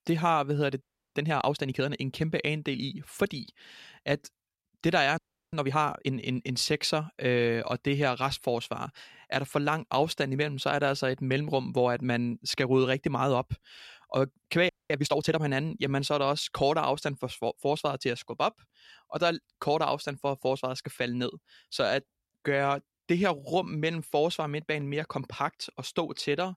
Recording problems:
audio freezing; at 1 s, at 5 s and at 15 s

